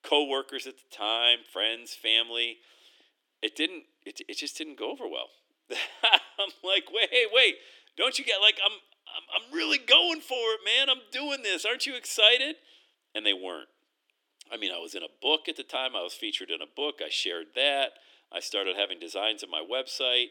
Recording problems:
thin; somewhat; fading below 300 Hz

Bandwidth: 17.5 kHz